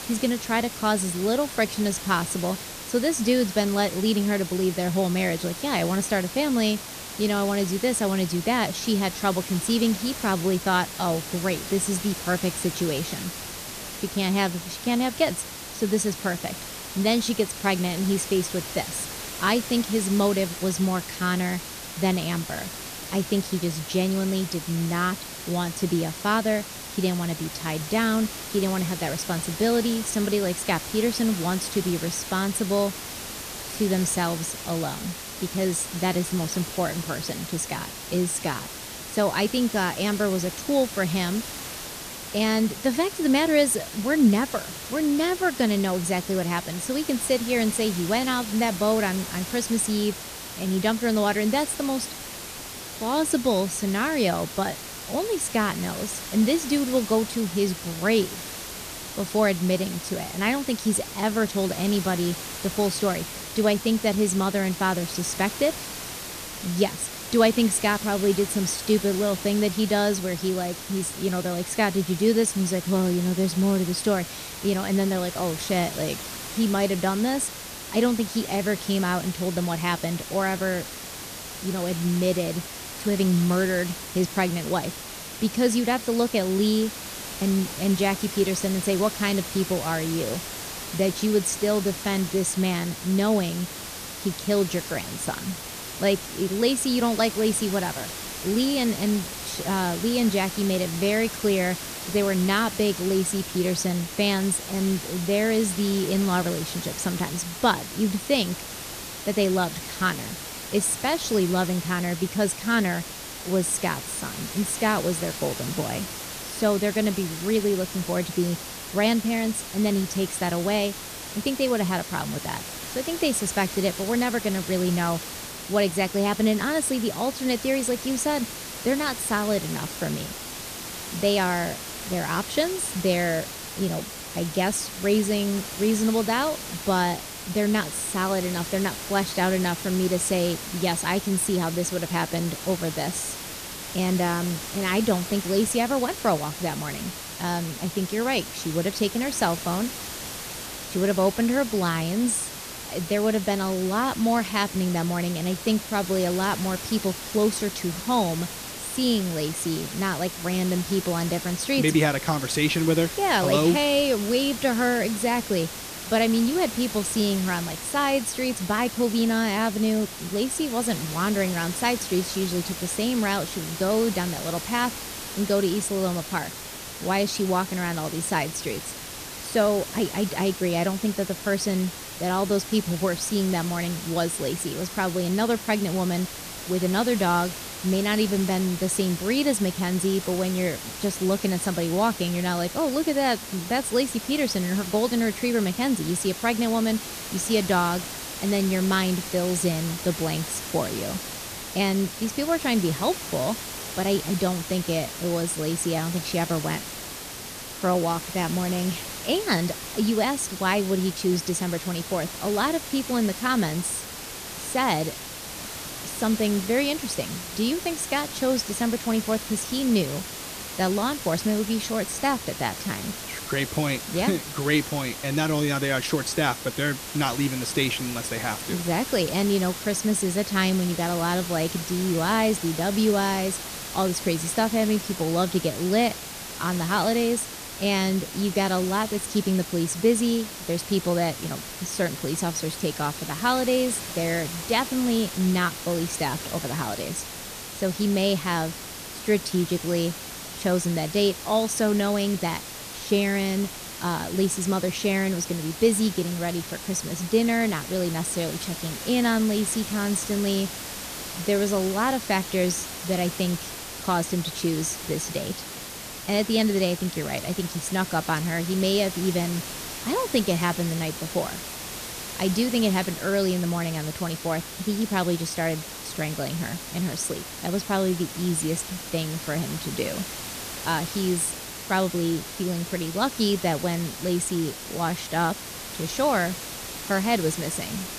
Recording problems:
hiss; loud; throughout; 8 dB below the speech

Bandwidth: 14.5 kHz